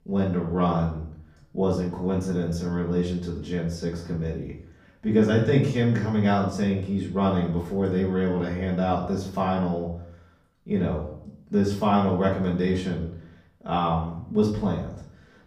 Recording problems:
off-mic speech; far
room echo; slight; dies away in 0.5 s

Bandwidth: 15 kHz